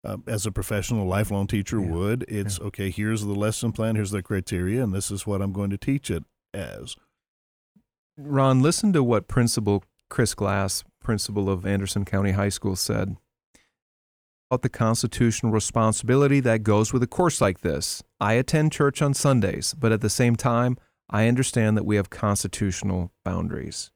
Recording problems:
audio cutting out; at 14 s for 0.5 s

